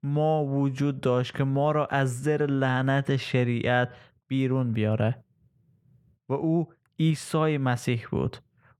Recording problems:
muffled; slightly; fading above 3.5 kHz

